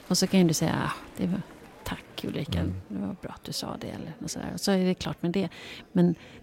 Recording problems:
alarms or sirens; faint; throughout; 20 dB below the speech
murmuring crowd; faint; throughout; 25 dB below the speech

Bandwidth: 16 kHz